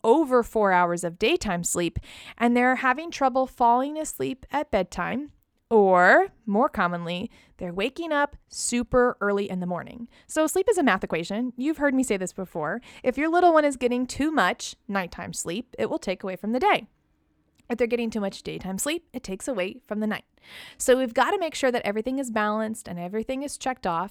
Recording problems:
uneven, jittery; strongly; from 2 to 21 s

